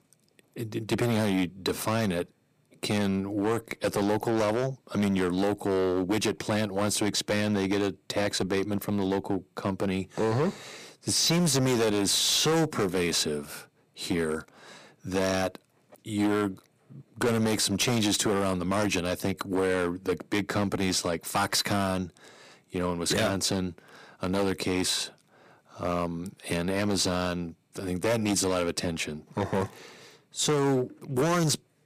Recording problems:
distortion; heavy; 10% of the sound clipped

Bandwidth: 15 kHz